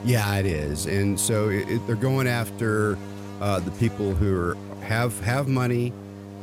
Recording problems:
electrical hum; noticeable; throughout; 50 Hz, 15 dB below the speech

